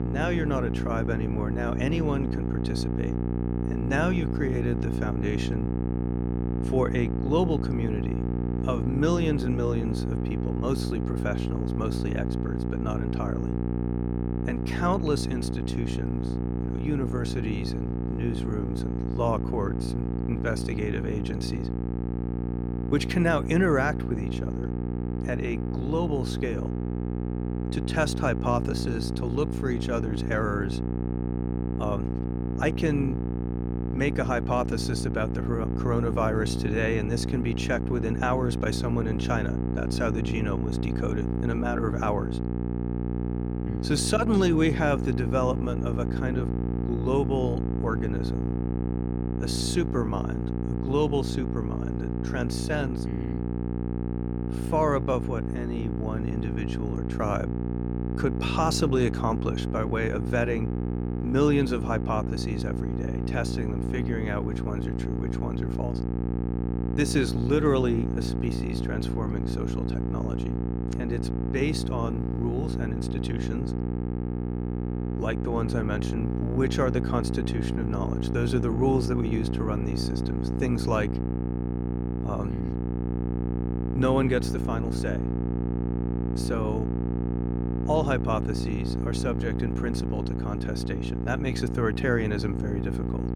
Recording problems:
electrical hum; loud; throughout; 60 Hz, 5 dB below the speech

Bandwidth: 18 kHz